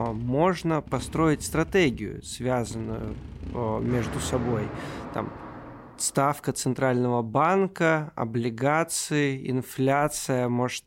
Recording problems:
traffic noise; noticeable; until 6 s; 15 dB below the speech
abrupt cut into speech; at the start

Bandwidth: 16 kHz